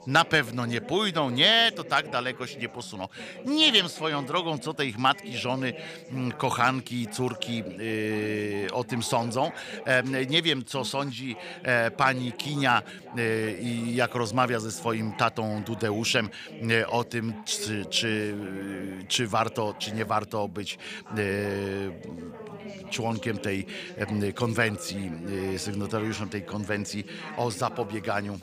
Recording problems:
background chatter; noticeable; throughout; 3 voices, 15 dB below the speech

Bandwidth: 15 kHz